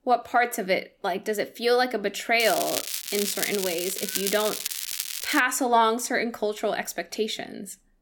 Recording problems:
crackling; loud; from 2.5 to 5.5 s; 3 dB below the speech

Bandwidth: 18 kHz